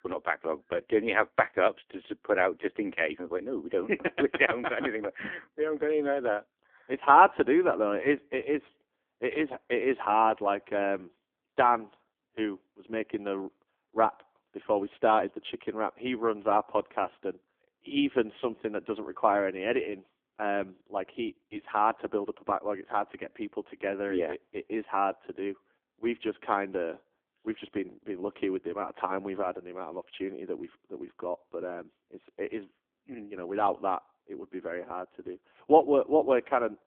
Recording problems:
phone-call audio; poor line; nothing above 3.5 kHz
muffled; very slightly; fading above 3 kHz

